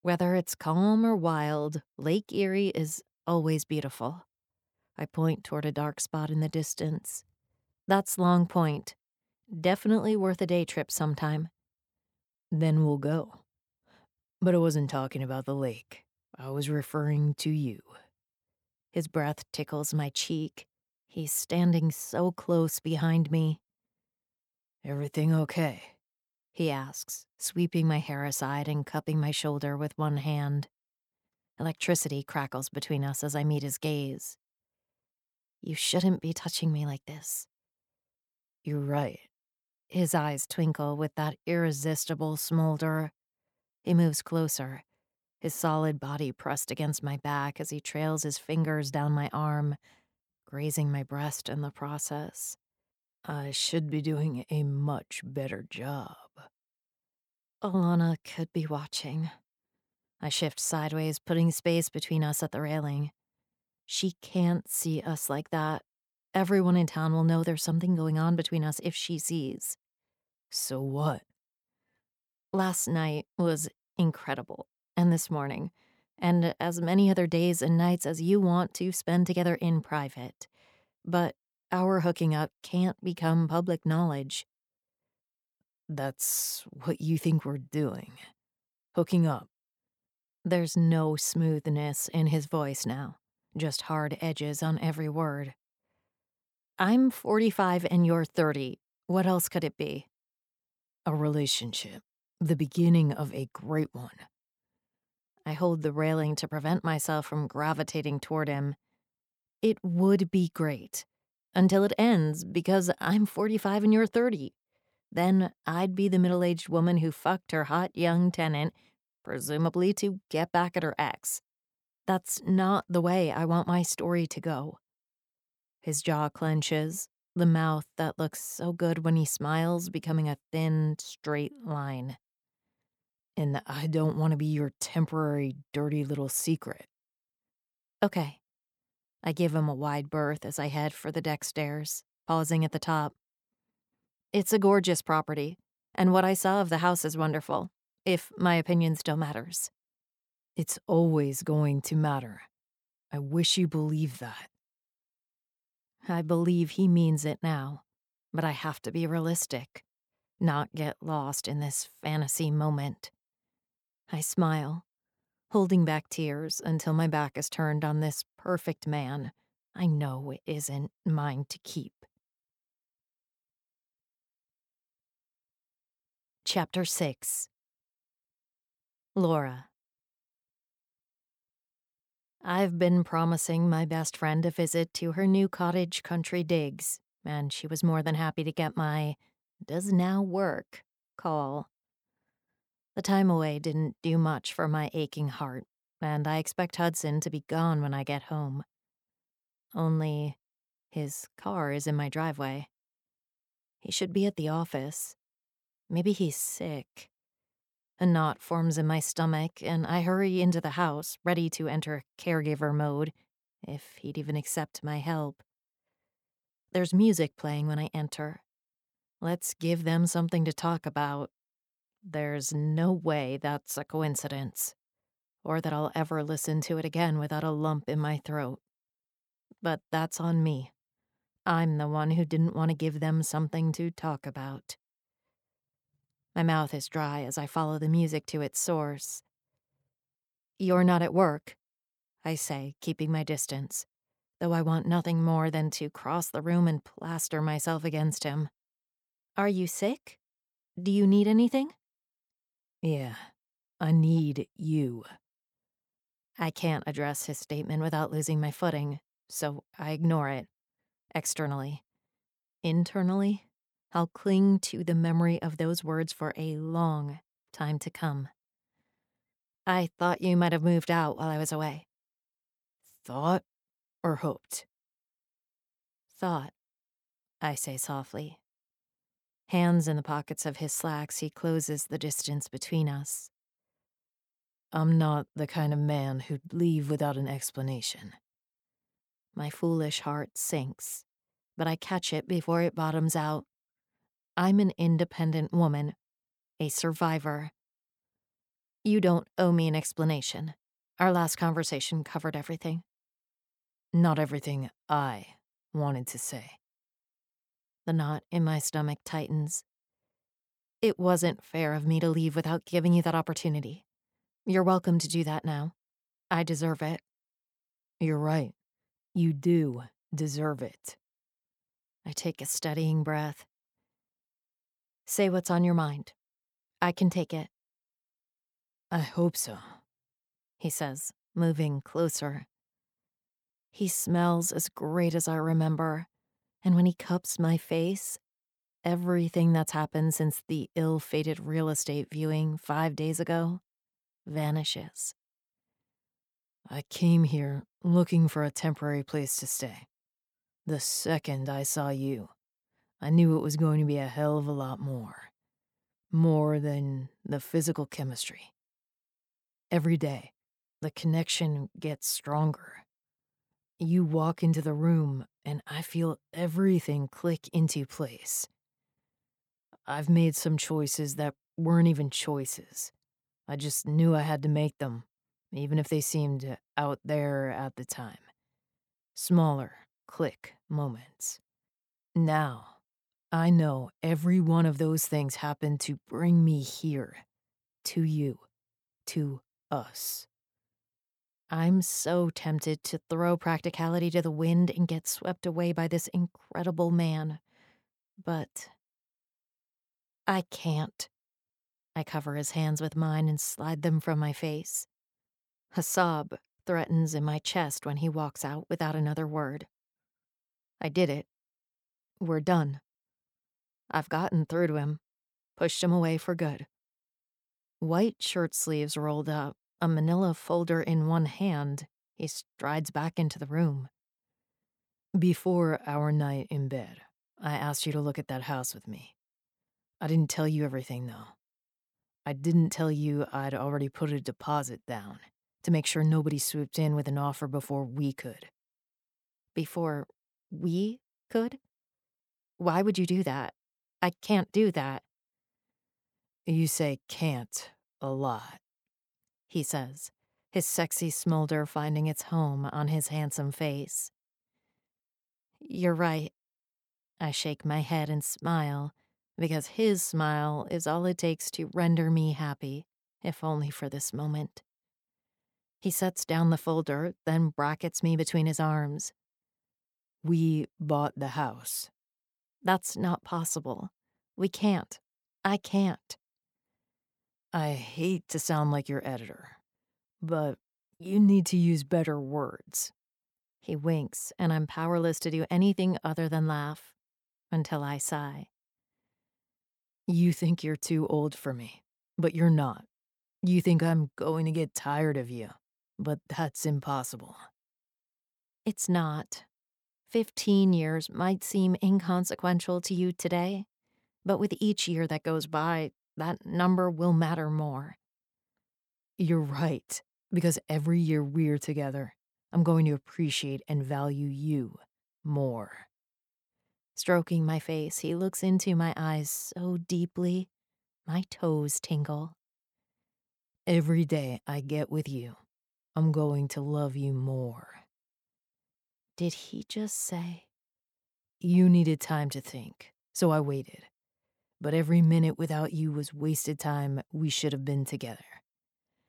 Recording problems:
none

